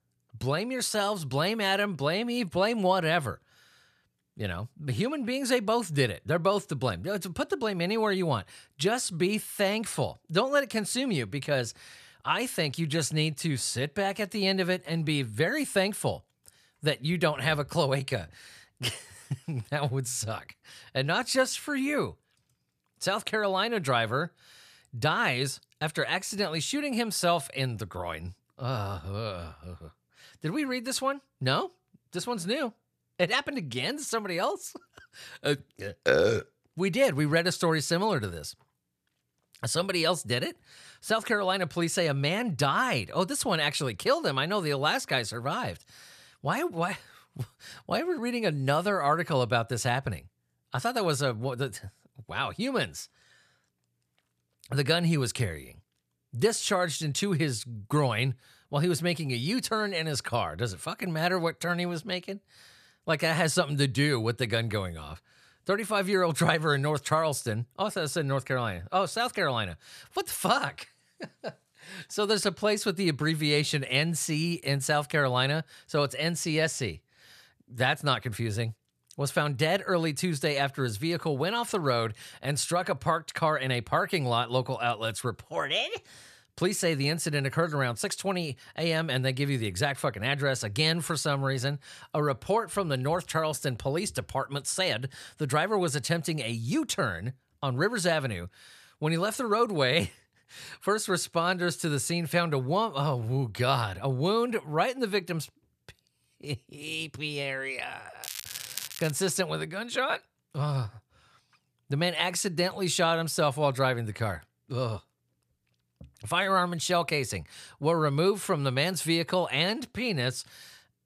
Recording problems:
crackling; loud; at 1:48; 9 dB below the speech

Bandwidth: 14.5 kHz